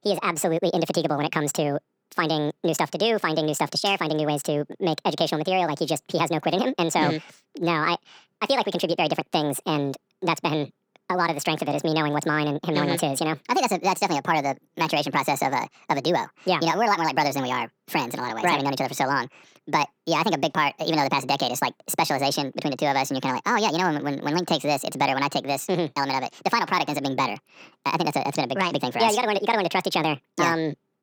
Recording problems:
wrong speed and pitch; too fast and too high; 1.6 times normal speed

